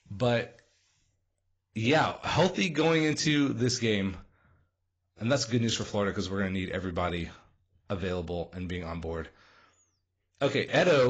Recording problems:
garbled, watery; badly; nothing above 7.5 kHz
abrupt cut into speech; at the end

